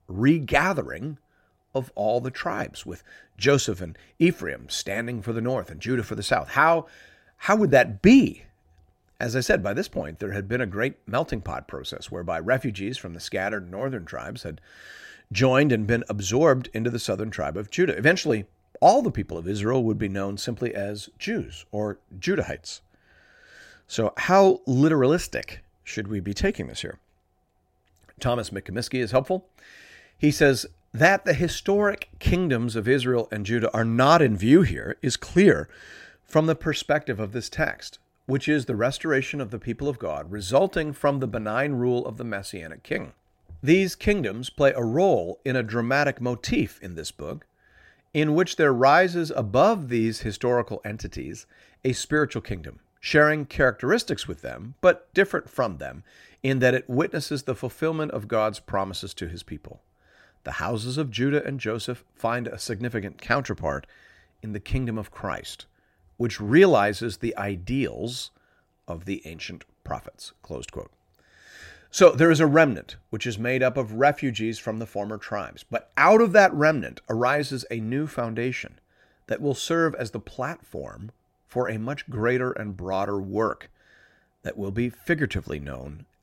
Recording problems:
none

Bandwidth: 16 kHz